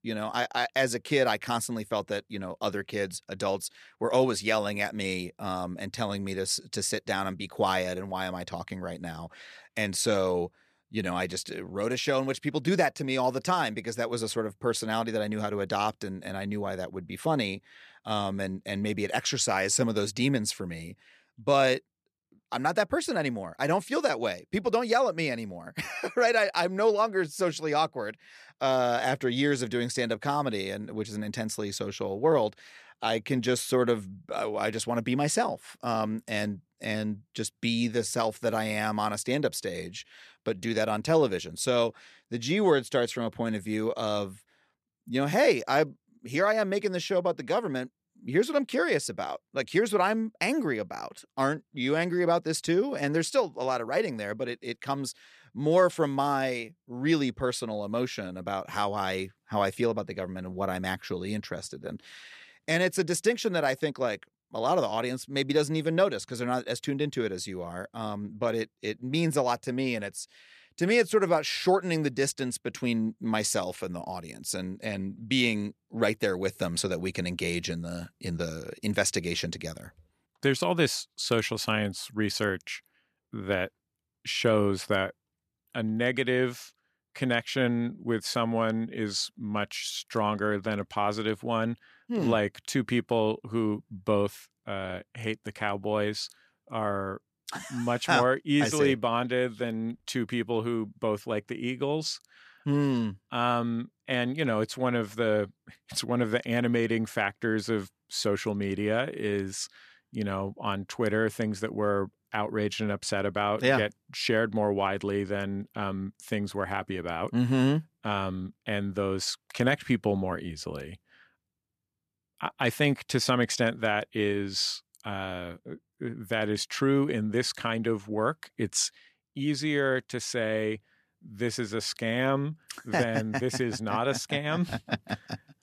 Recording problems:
none

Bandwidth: 14 kHz